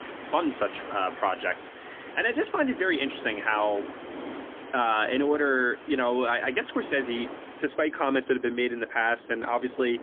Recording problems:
phone-call audio; poor line; nothing above 3.5 kHz
wind in the background; noticeable; throughout; 15 dB below the speech

